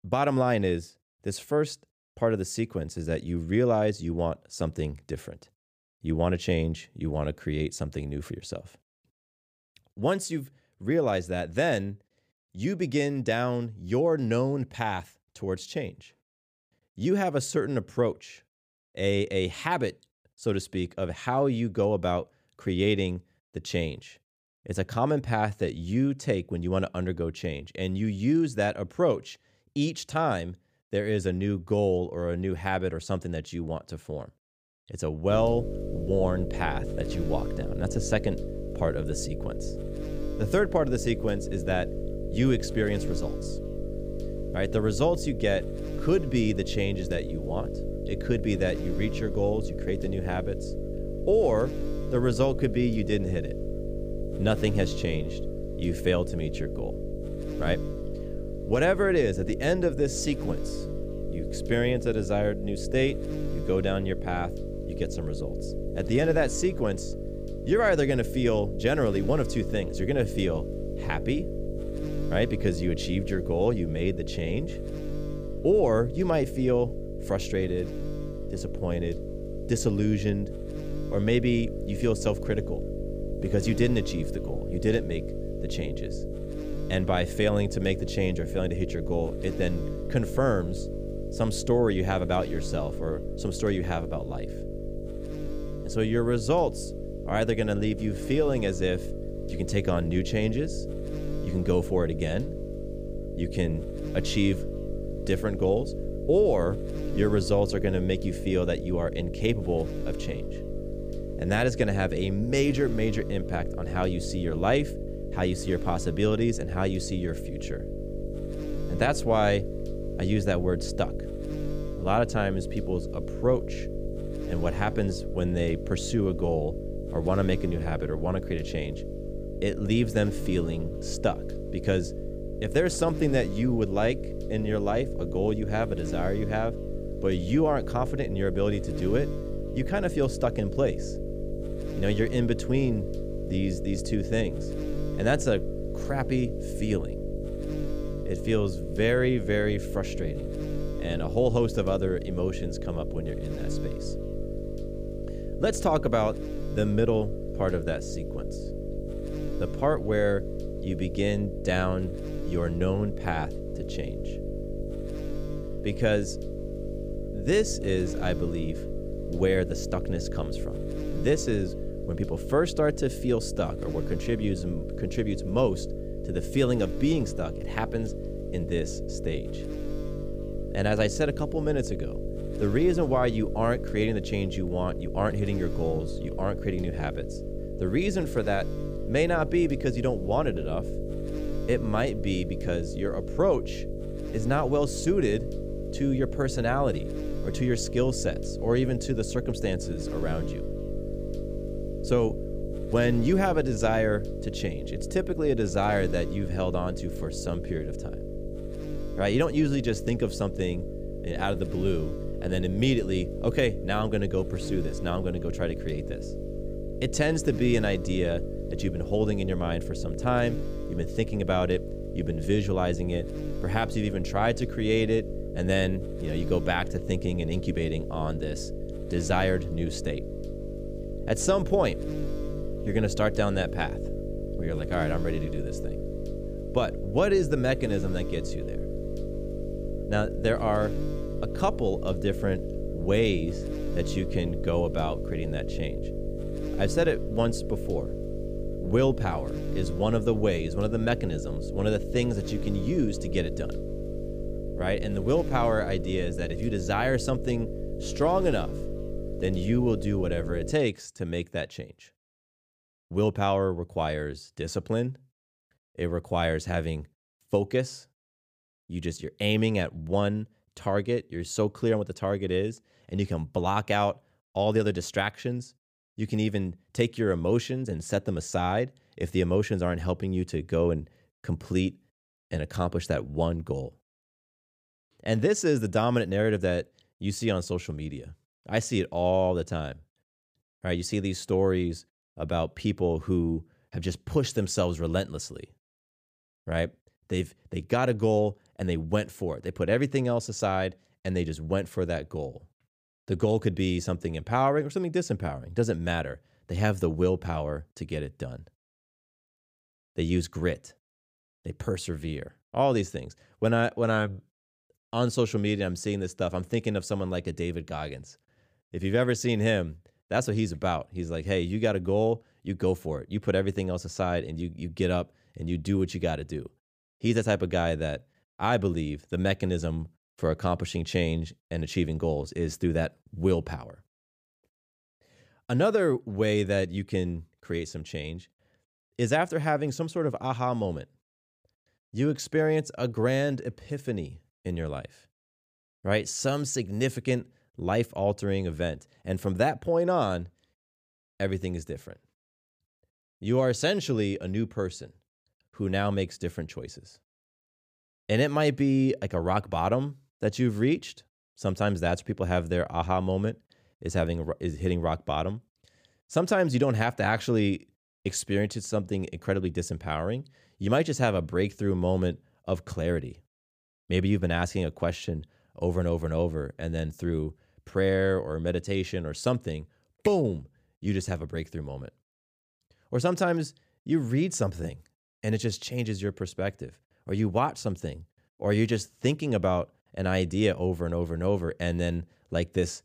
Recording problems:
electrical hum; loud; from 35 s to 4:21; 50 Hz, 9 dB below the speech

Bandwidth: 15 kHz